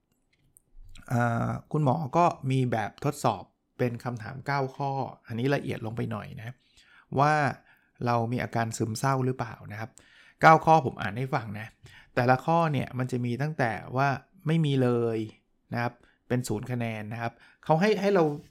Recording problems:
none

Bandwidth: 16.5 kHz